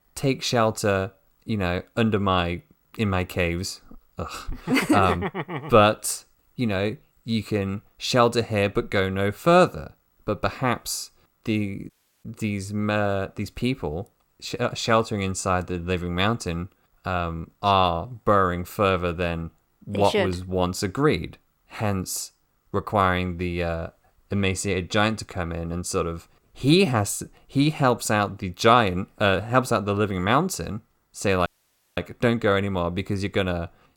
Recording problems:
audio cutting out; at 12 s and at 31 s for 0.5 s

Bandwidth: 17 kHz